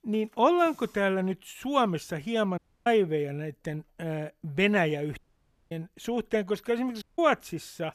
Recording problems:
audio cutting out; at 2.5 s, at 5 s for 0.5 s and at 7 s

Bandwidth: 14 kHz